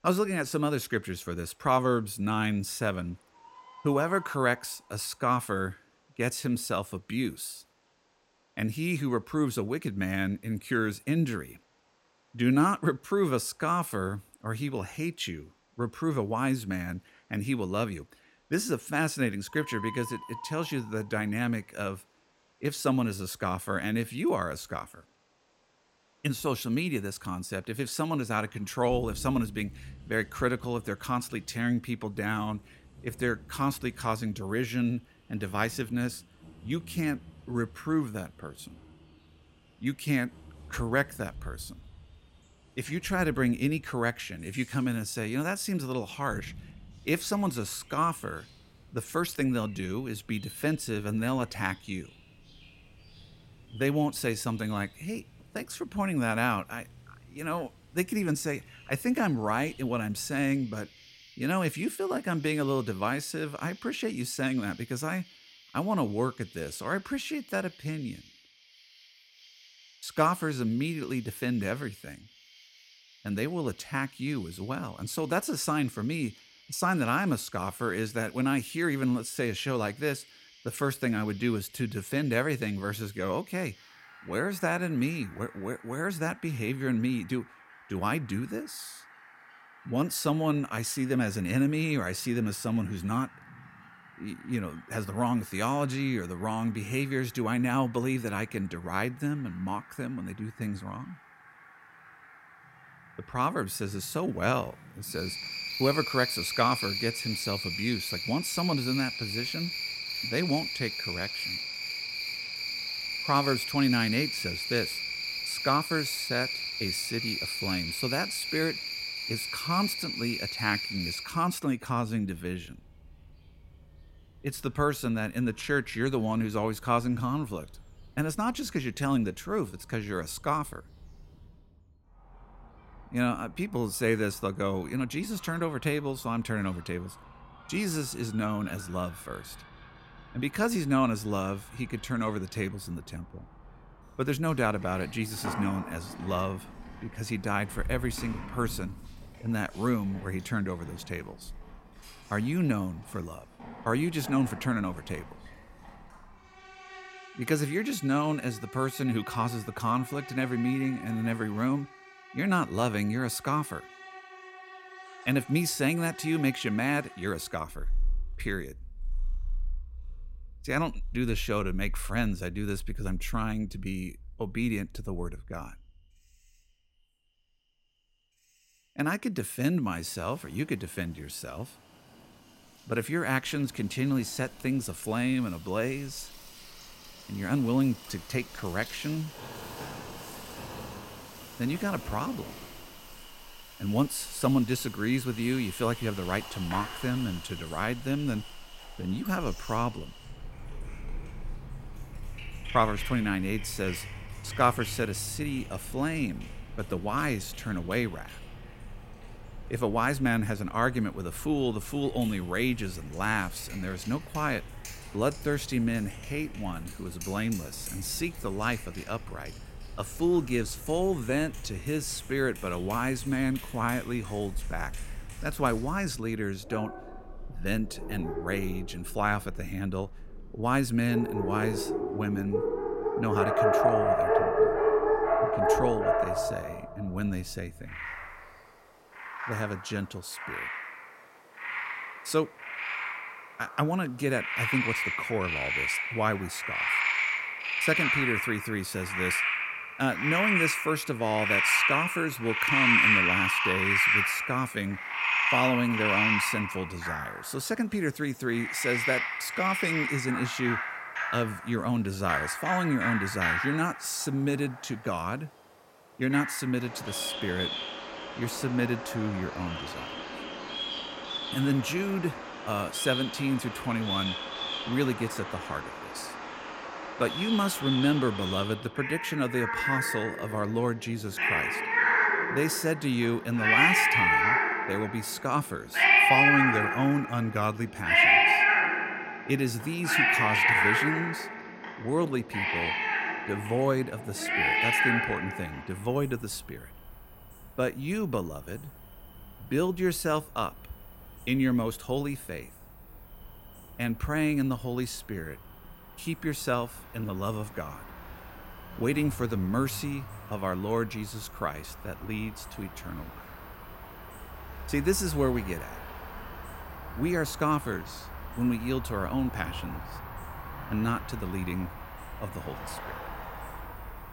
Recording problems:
animal sounds; very loud; throughout; 1 dB above the speech

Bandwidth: 16 kHz